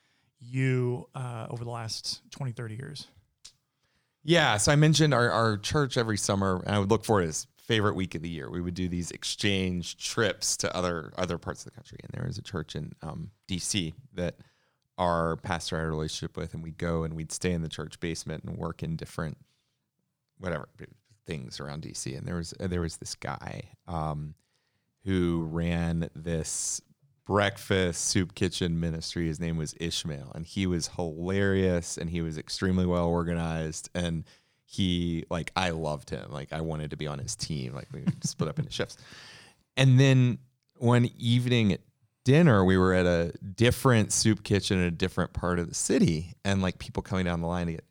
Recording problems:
none

